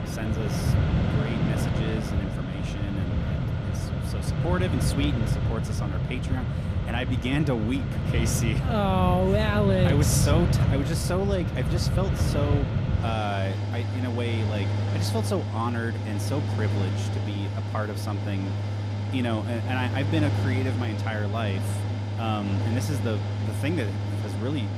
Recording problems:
machinery noise; very loud; throughout; 3 dB above the speech

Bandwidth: 14.5 kHz